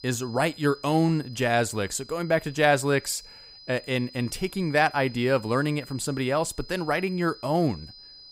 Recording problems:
high-pitched whine; noticeable; throughout; 5 kHz, 20 dB below the speech

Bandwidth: 15.5 kHz